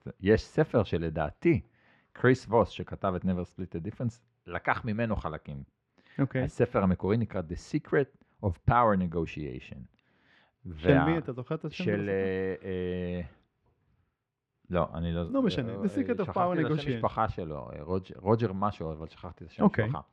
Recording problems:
muffled; slightly; fading above 2.5 kHz

